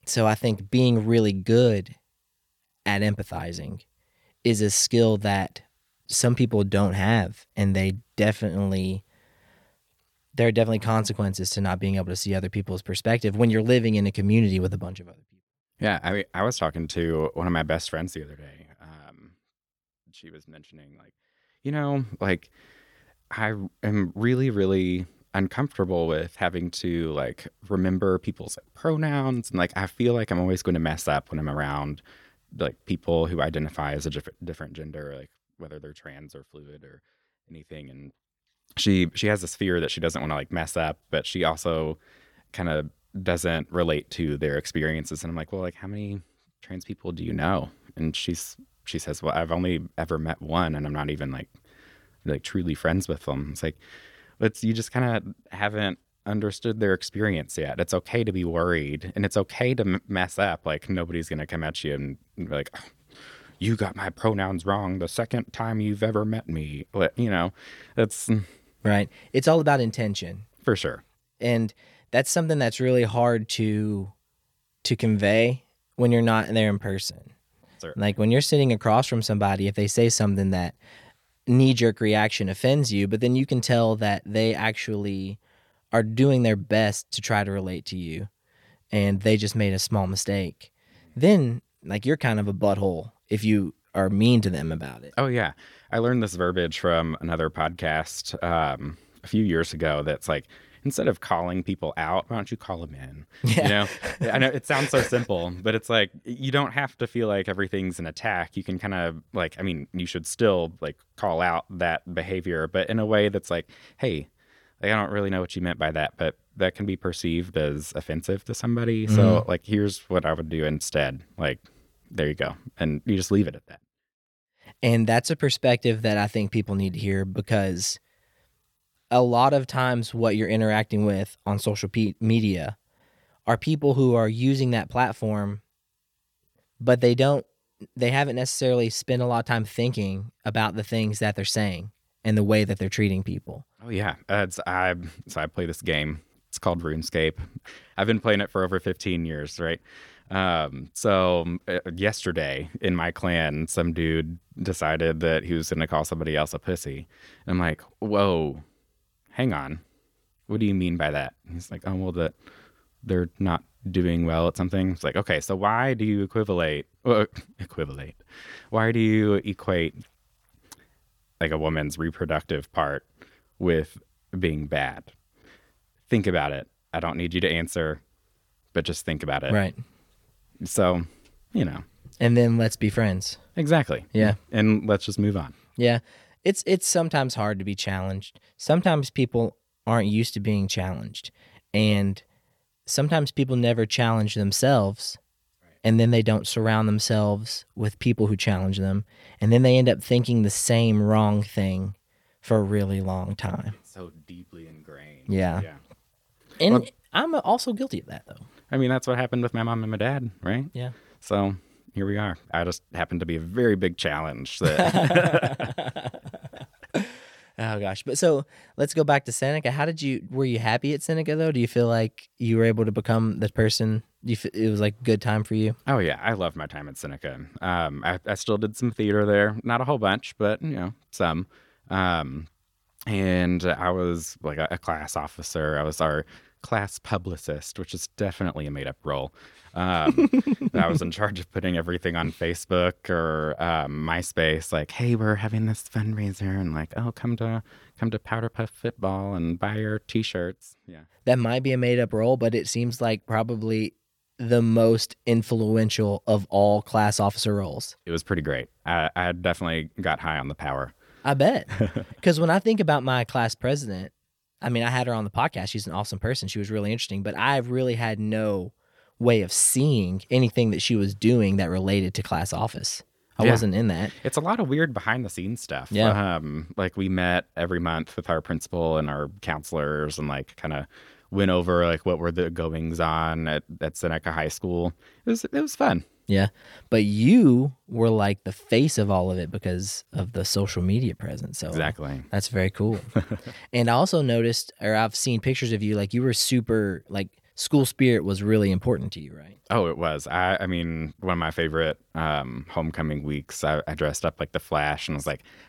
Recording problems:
none

